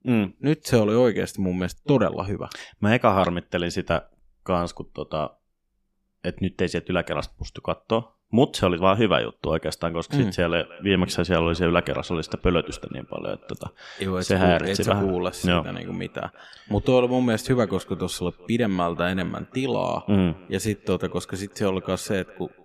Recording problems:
echo of what is said; faint; from 10 s on; 180 ms later, 25 dB below the speech

